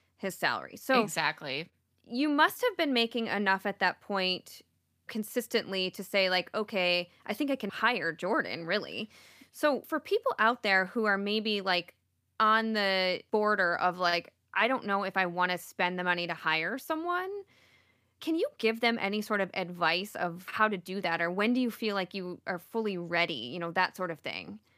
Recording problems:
none

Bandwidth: 15 kHz